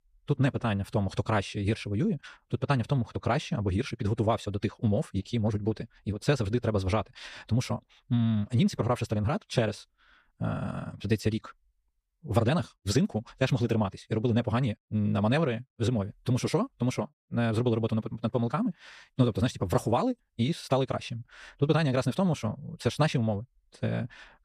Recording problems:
wrong speed, natural pitch; too fast; 1.5 times normal speed

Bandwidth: 14.5 kHz